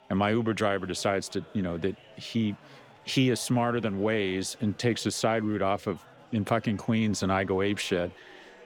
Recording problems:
chatter from many people; faint; throughout; 25 dB below the speech

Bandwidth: 18.5 kHz